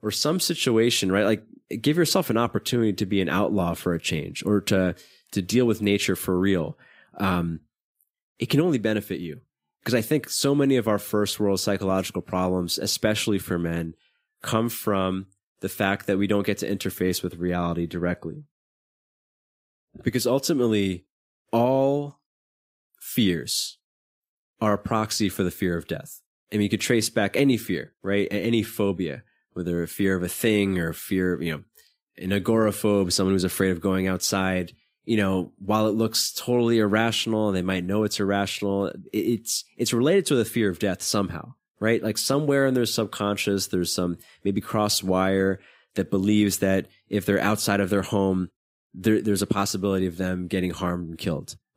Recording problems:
none

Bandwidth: 15.5 kHz